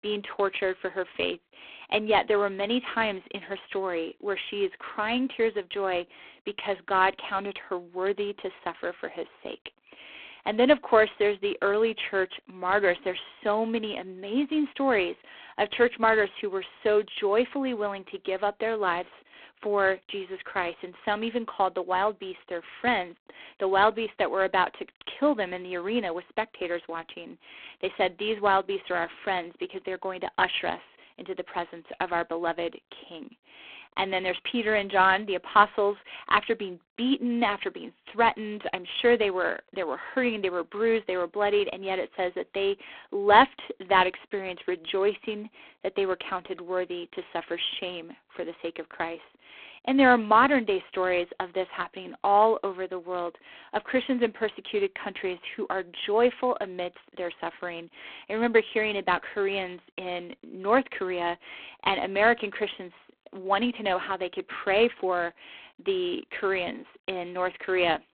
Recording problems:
phone-call audio; poor line

